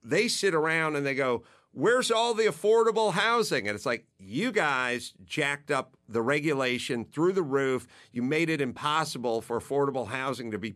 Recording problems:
none

